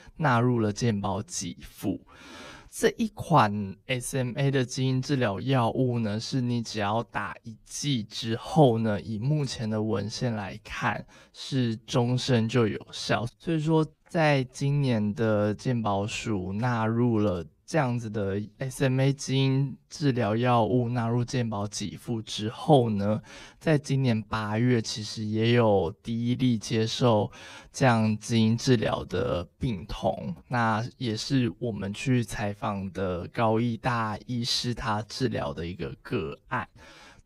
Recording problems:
wrong speed, natural pitch; too slow; 0.7 times normal speed

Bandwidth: 15.5 kHz